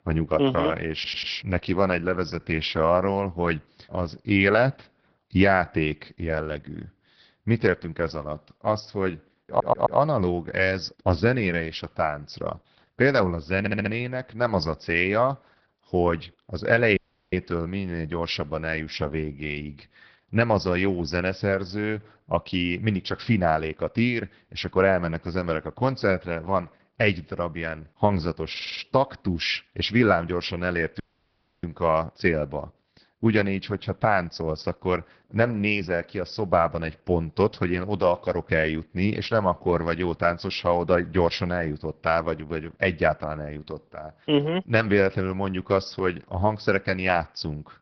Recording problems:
garbled, watery; badly
high frequencies cut off; noticeable; nothing above 5.5 kHz
audio stuttering; 4 times, first at 1 s
audio cutting out; at 17 s and at 31 s for 0.5 s

